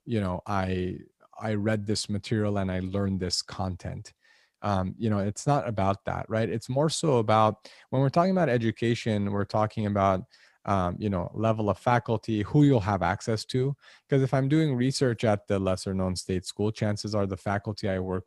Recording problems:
none

